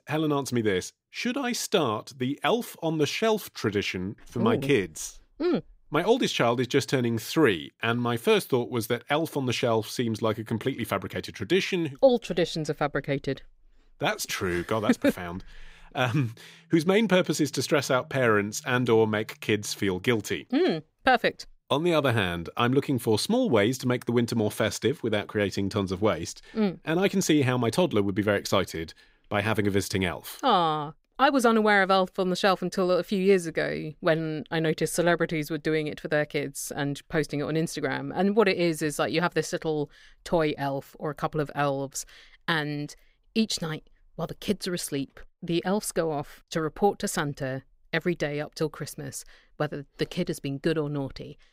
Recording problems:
none

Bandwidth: 15.5 kHz